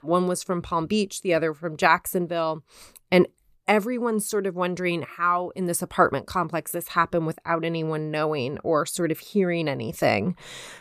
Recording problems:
none

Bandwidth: 14.5 kHz